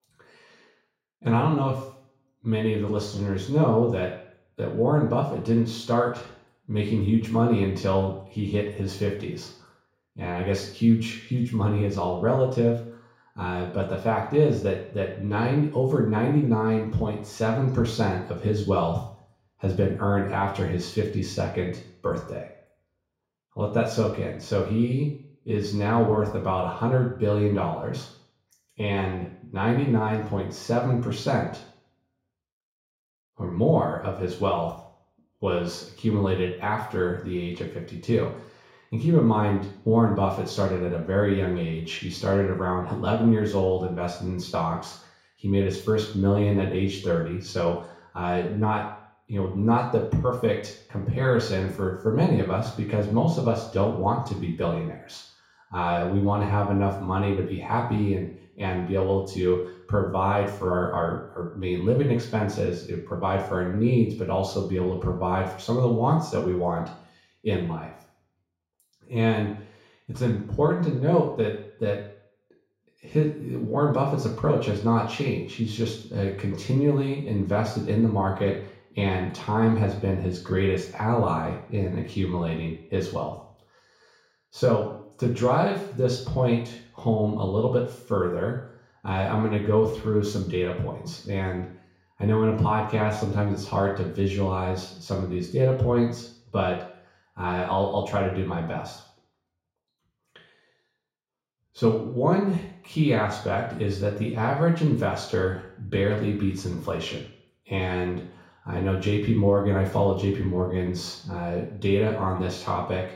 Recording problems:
off-mic speech; far
room echo; noticeable; dies away in 0.6 s

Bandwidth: 16 kHz